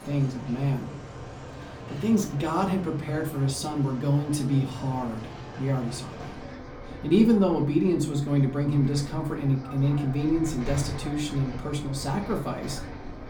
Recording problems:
off-mic speech; far
room echo; very slight; dies away in 0.4 s
traffic noise; noticeable; throughout; 15 dB below the speech

